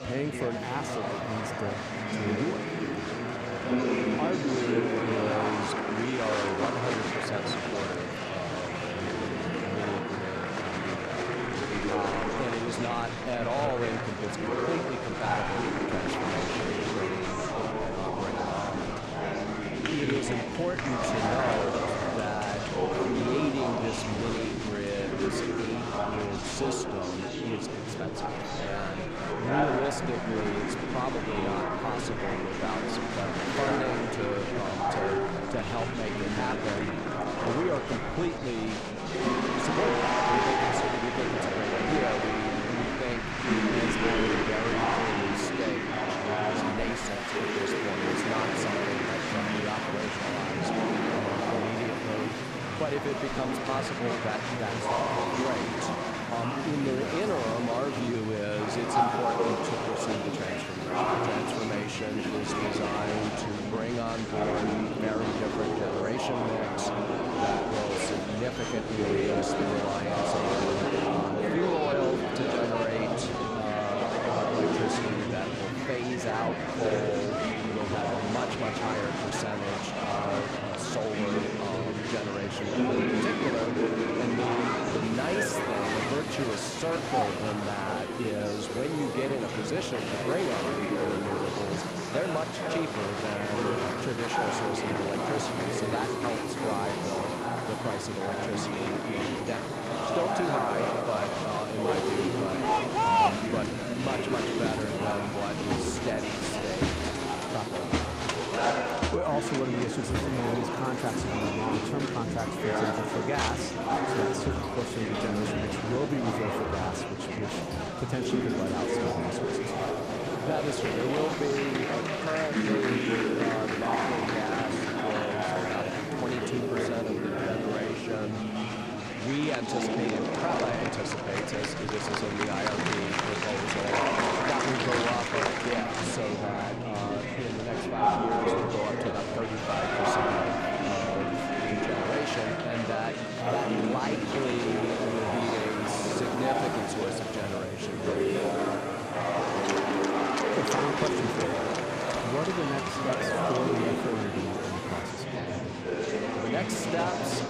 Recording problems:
murmuring crowd; very loud; throughout; 4 dB above the speech
household noises; noticeable; throughout; 10 dB below the speech

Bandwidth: 14.5 kHz